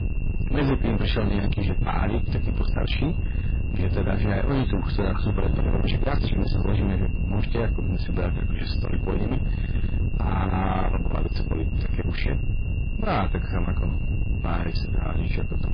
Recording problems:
distortion; heavy; 6 dB below the speech
garbled, watery; badly; nothing above 5 kHz
wind noise on the microphone; heavy; 6 dB below the speech
high-pitched whine; noticeable; throughout; 3 kHz, 20 dB below the speech

